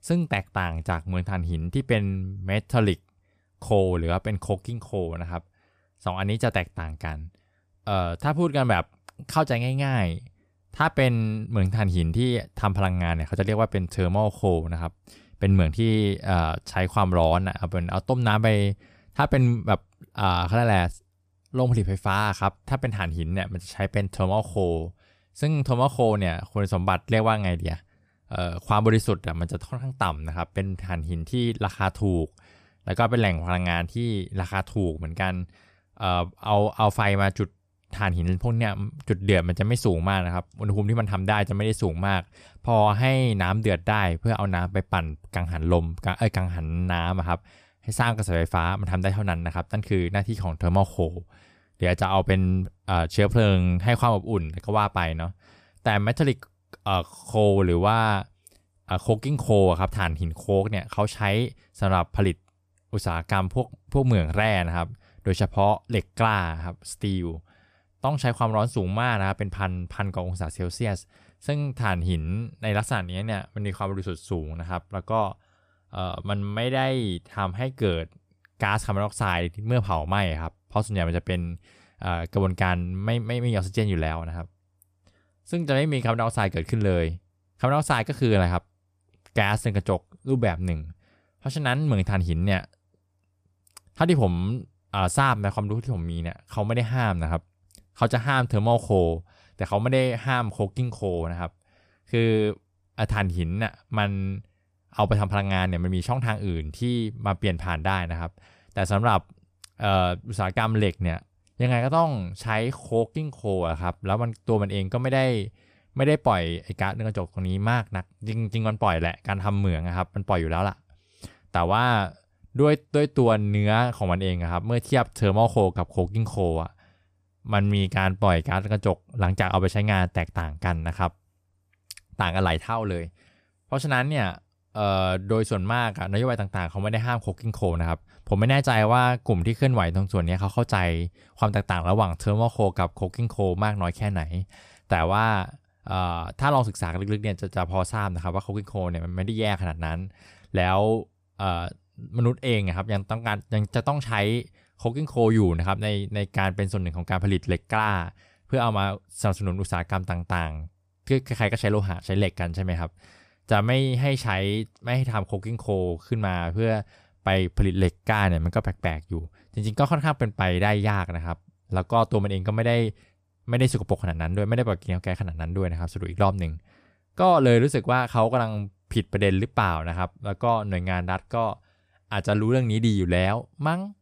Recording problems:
none

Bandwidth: 14.5 kHz